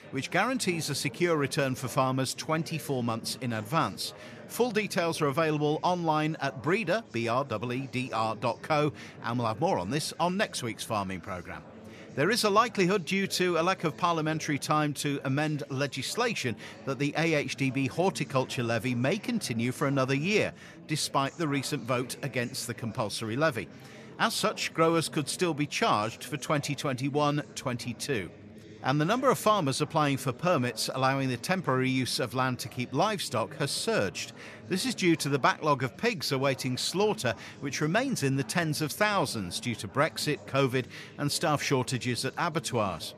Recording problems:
chatter from many people; noticeable; throughout; 20 dB below the speech

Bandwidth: 14.5 kHz